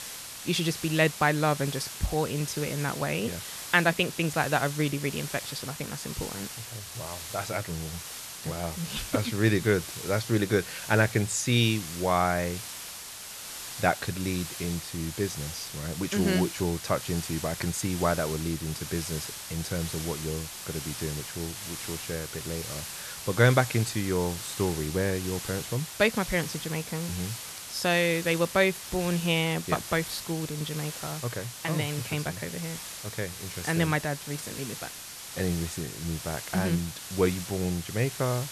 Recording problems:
hiss; loud; throughout; 8 dB below the speech

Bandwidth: 13.5 kHz